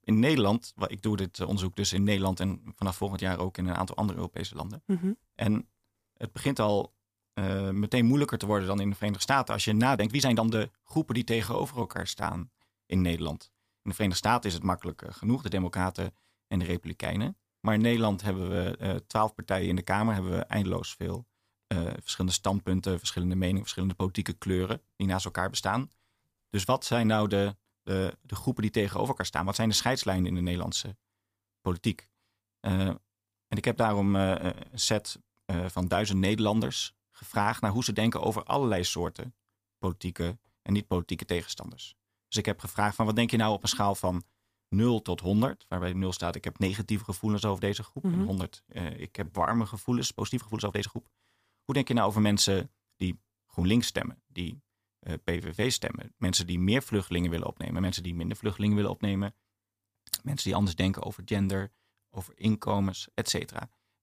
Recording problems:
uneven, jittery; strongly; from 7.5 s to 1:03

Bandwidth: 15 kHz